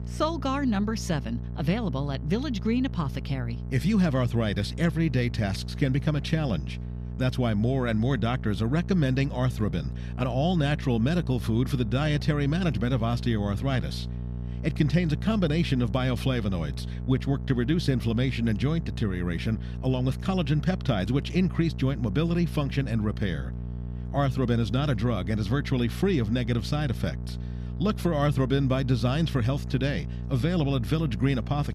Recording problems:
electrical hum; noticeable; throughout; 60 Hz, 15 dB below the speech

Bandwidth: 14.5 kHz